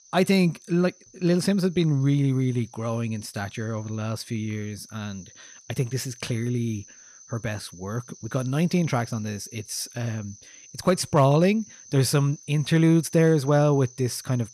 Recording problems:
animal sounds; faint; throughout; 20 dB below the speech

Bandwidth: 14.5 kHz